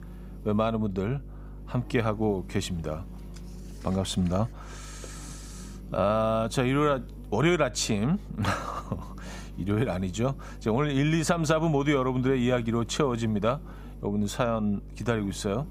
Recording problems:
electrical hum; faint; throughout; 50 Hz, 25 dB below the speech

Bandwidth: 15.5 kHz